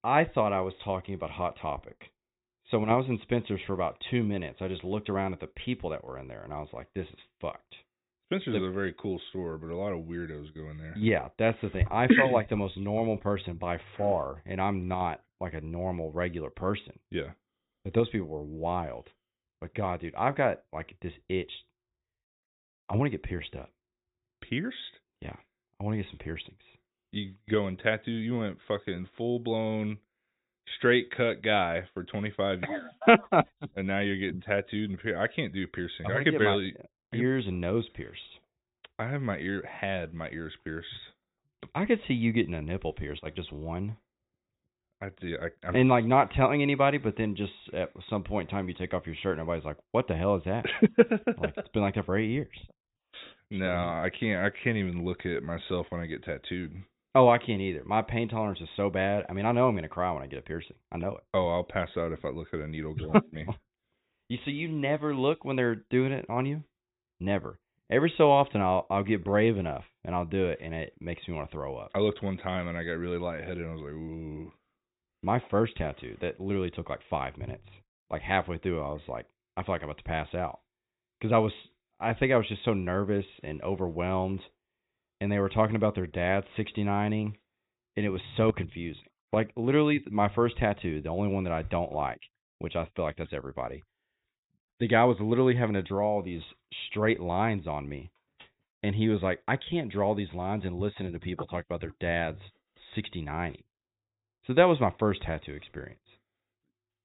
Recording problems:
high frequencies cut off; severe; nothing above 4 kHz

